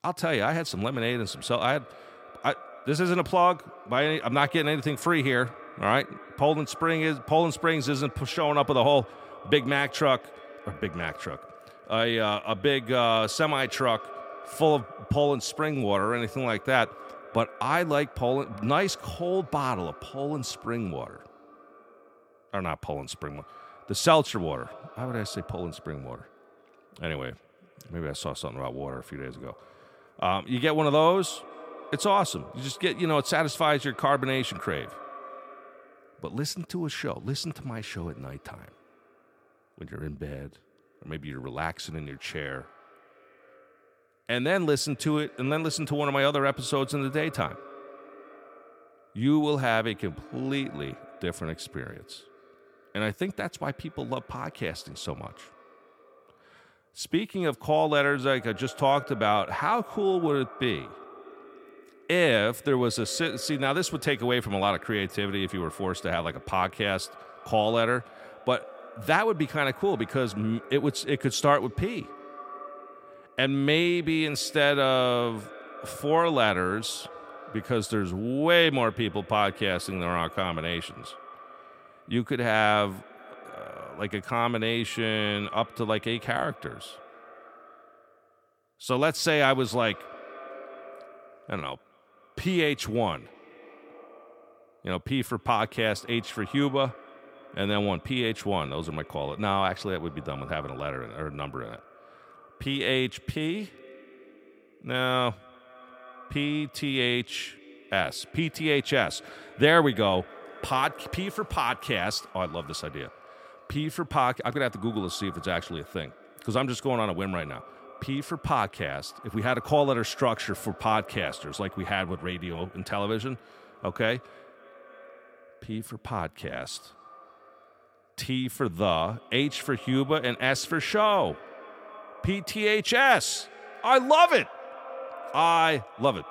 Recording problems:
echo of what is said; faint; throughout; 270 ms later, 20 dB below the speech

